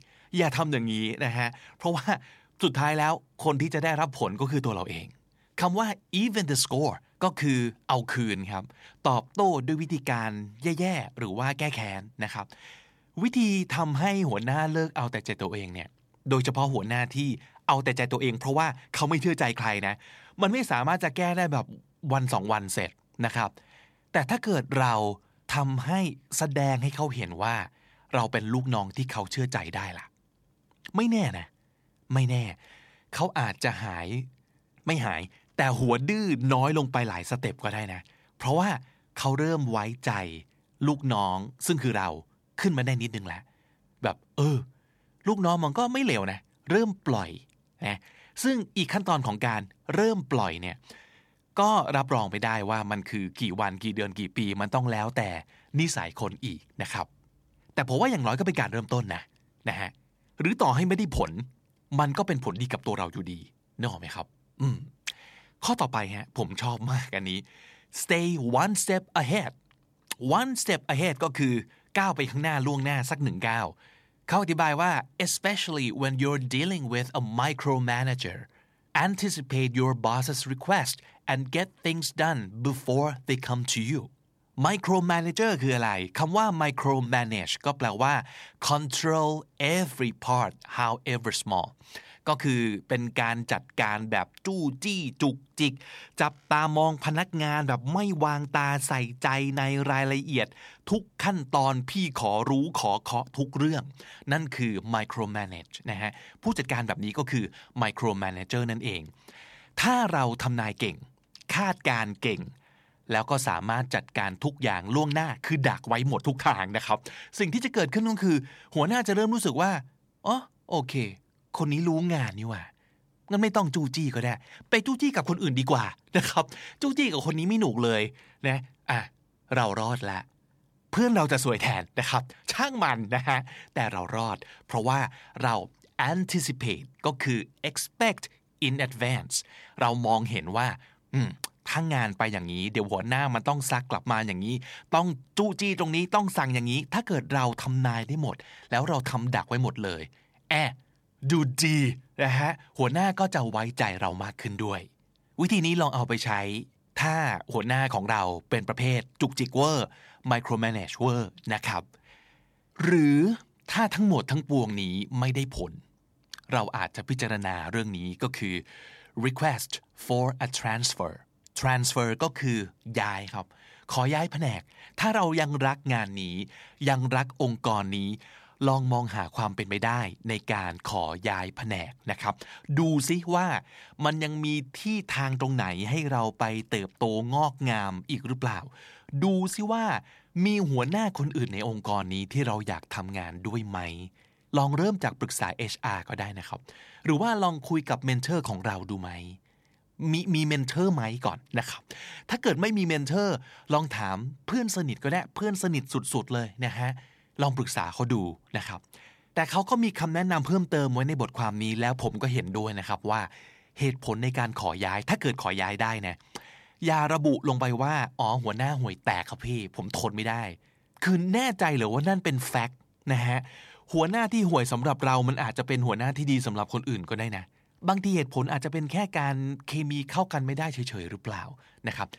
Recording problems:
none

